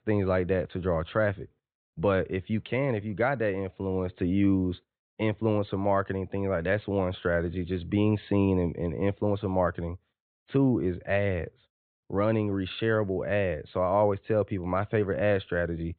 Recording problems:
high frequencies cut off; severe; nothing above 4 kHz

